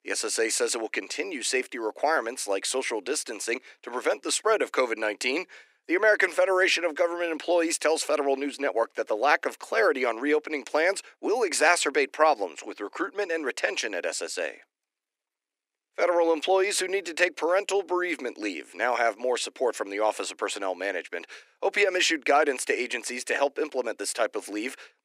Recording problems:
thin; somewhat; fading below 300 Hz

